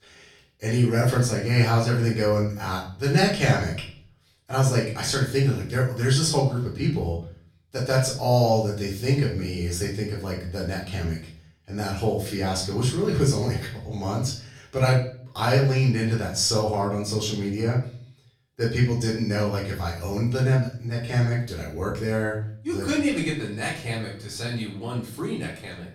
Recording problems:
off-mic speech; far
room echo; slight; dies away in 0.5 s

